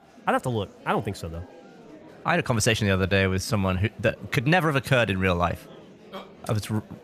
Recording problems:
murmuring crowd; faint; throughout; 25 dB below the speech
uneven, jittery; strongly; from 2 to 5 s

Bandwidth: 15 kHz